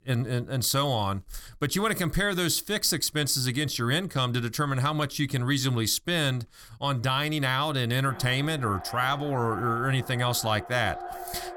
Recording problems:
echo of what is said; noticeable; from 8 s on; 600 ms later, 15 dB below the speech

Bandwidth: 17.5 kHz